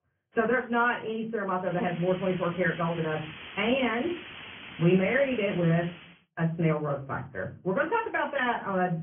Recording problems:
off-mic speech; far
high frequencies cut off; severe; nothing above 3 kHz
room echo; slight; dies away in 0.4 s
garbled, watery; slightly
hiss; noticeable; from 1.5 to 6 s; 15 dB below the speech

